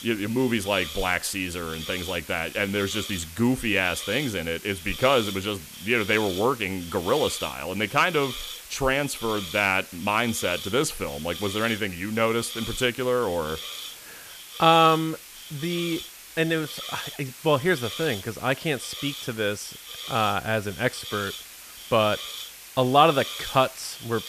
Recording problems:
hiss; noticeable; throughout; 10 dB below the speech

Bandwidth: 14.5 kHz